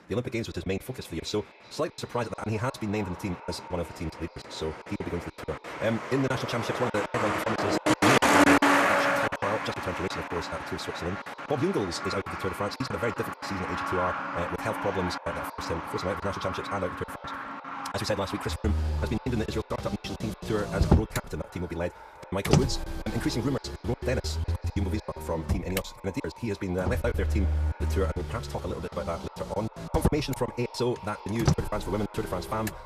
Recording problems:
wrong speed, natural pitch; too fast; 1.7 times normal speed
echo of what is said; noticeable; throughout; 370 ms later, 15 dB below the speech
traffic noise; very loud; throughout; 3 dB above the speech
choppy; very; 14% of the speech affected

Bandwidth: 14.5 kHz